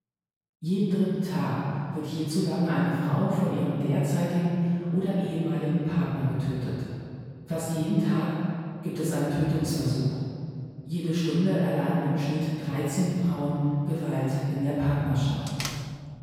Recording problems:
room echo; strong; dies away in 2.2 s
off-mic speech; far
door banging; noticeable; at 15 s; peak 6 dB below the speech

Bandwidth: 16.5 kHz